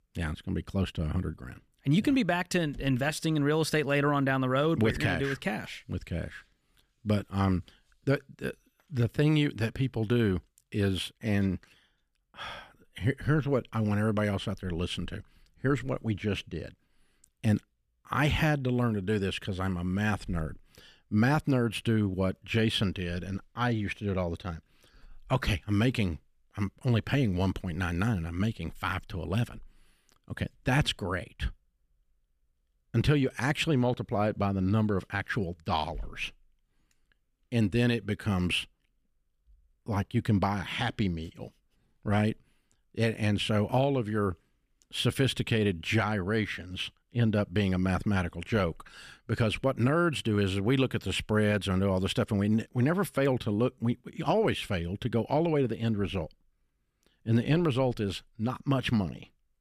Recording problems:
none

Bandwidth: 14.5 kHz